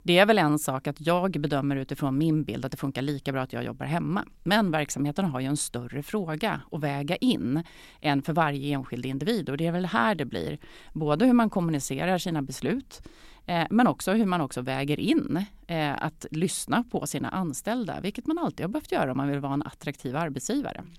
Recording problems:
none

